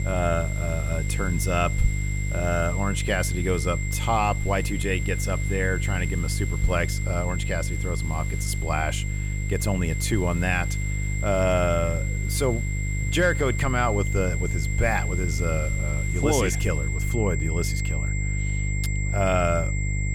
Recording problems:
high-pitched whine; loud; throughout; 2 kHz, 7 dB below the speech
electrical hum; noticeable; throughout; 50 Hz, 15 dB below the speech
household noises; faint; throughout; 25 dB below the speech

